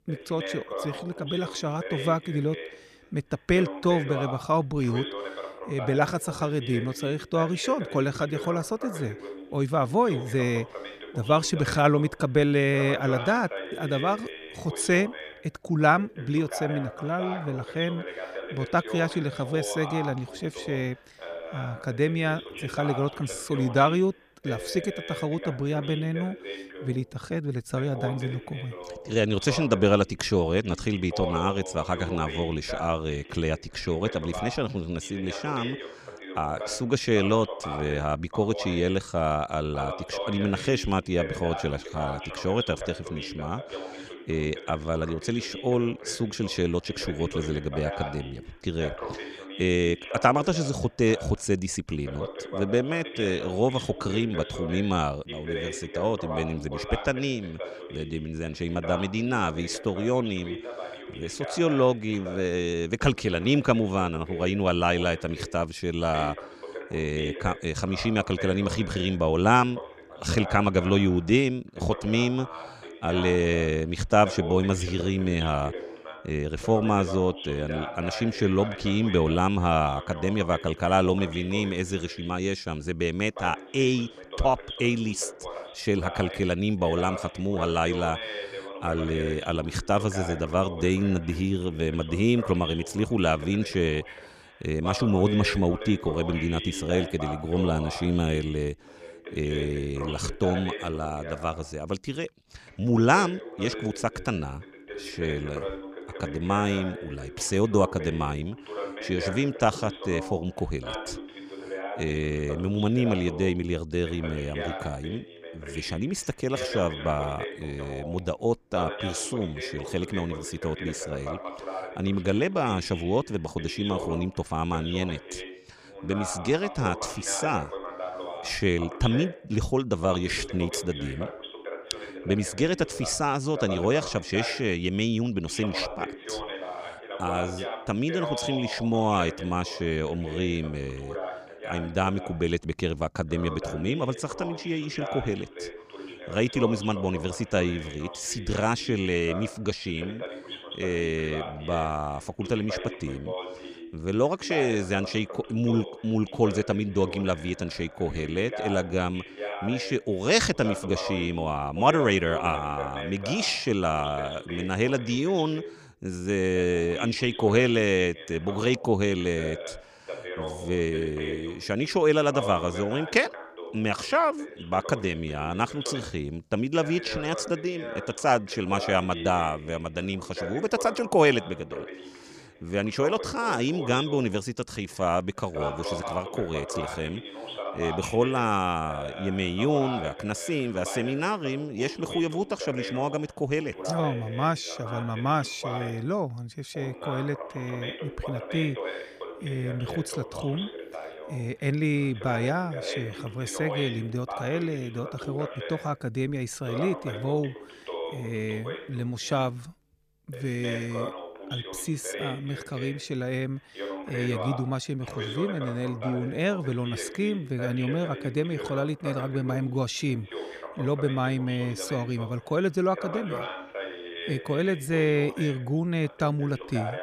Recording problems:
voice in the background; noticeable; throughout; 10 dB below the speech

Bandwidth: 15 kHz